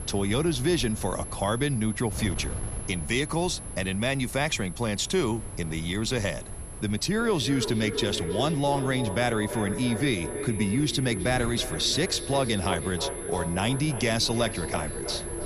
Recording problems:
echo of what is said; strong; from 7 s on; 320 ms later, 9 dB below the speech
high-pitched whine; noticeable; throughout; 11 kHz, 10 dB below the speech
wind noise on the microphone; occasional gusts; 20 dB below the speech

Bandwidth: 13.5 kHz